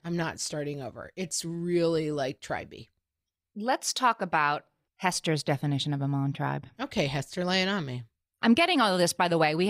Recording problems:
abrupt cut into speech; at the end

